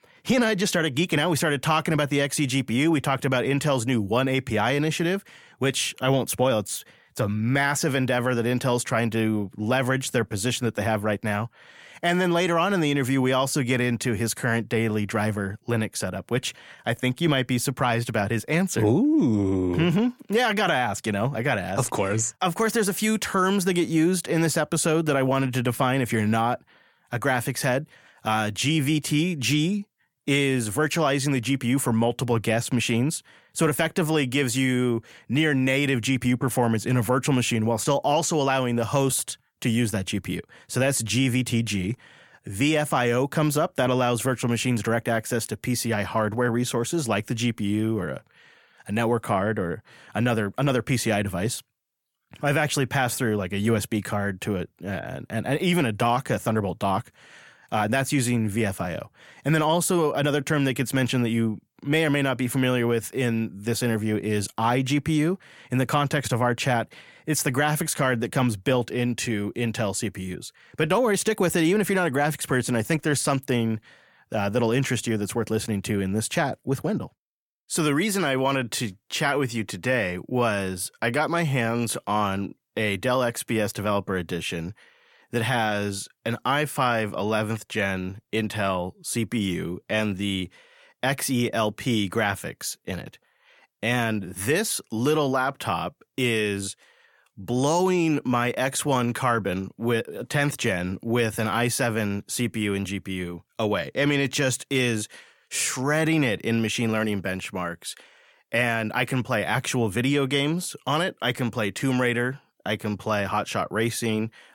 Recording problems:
none

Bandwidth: 17 kHz